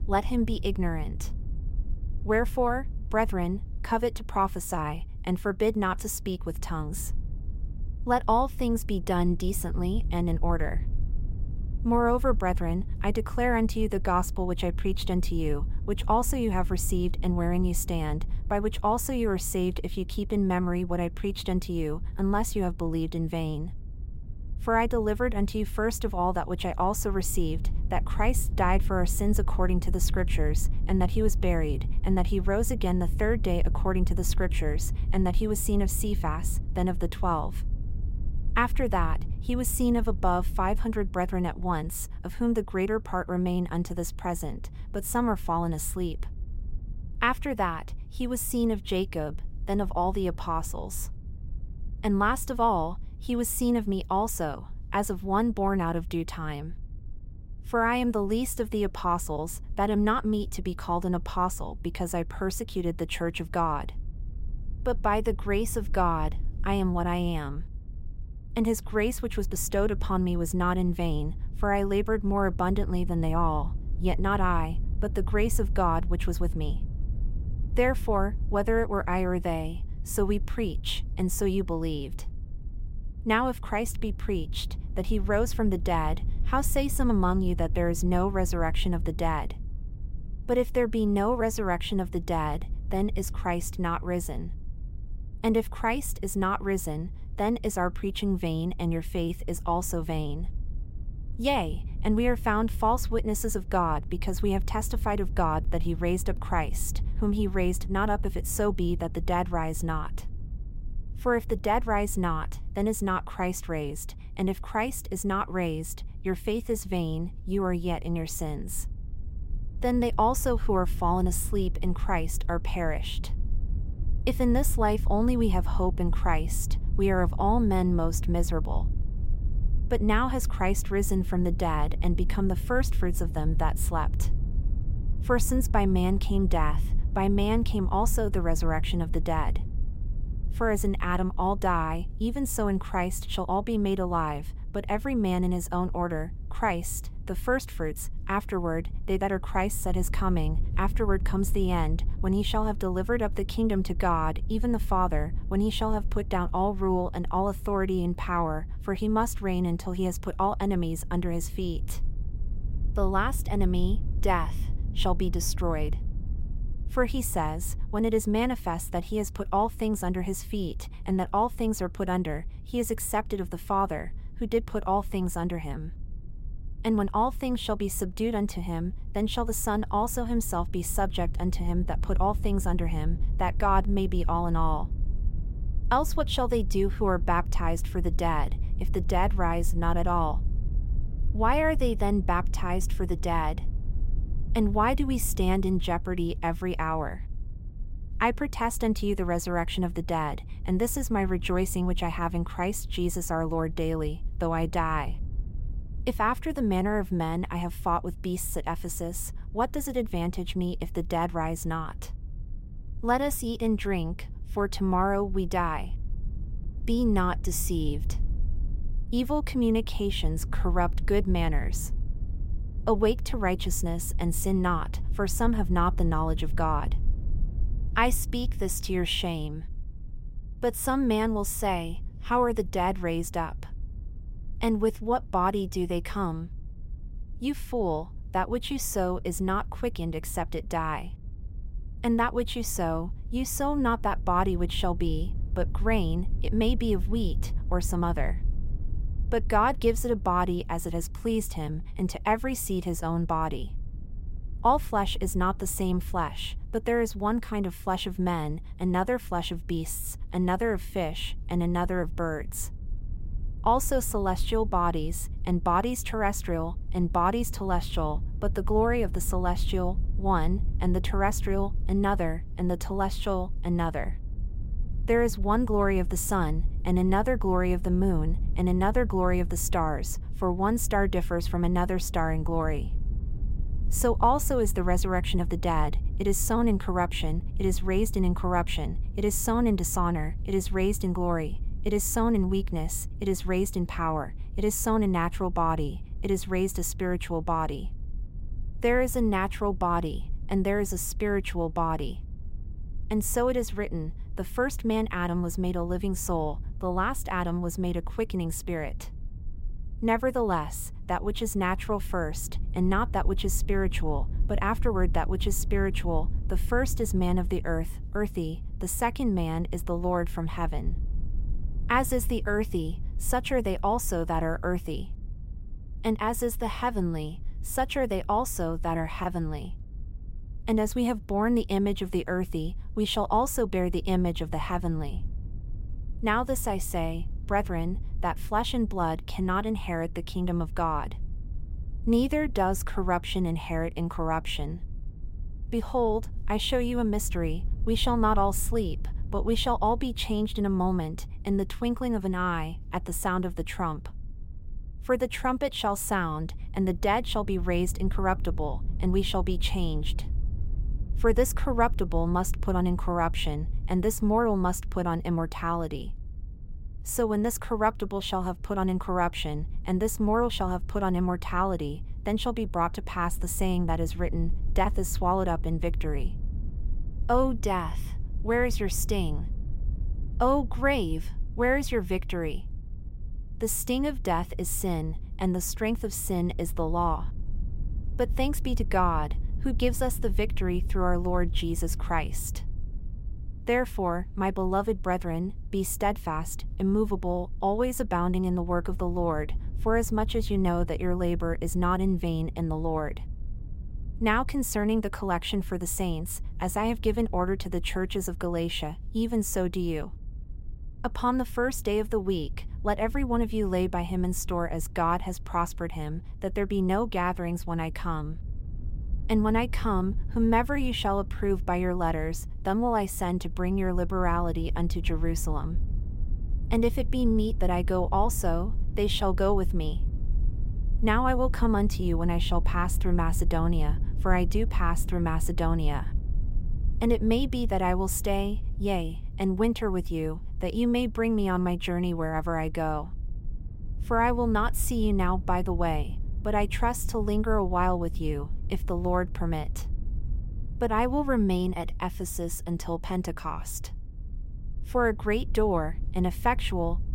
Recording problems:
low rumble; faint; throughout; 25 dB below the speech

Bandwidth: 16 kHz